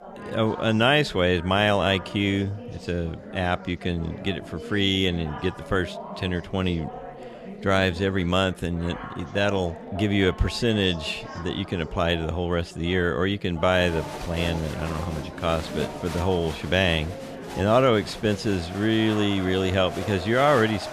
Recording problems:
chatter from many people; noticeable; throughout; 15 dB below the speech

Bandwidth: 14 kHz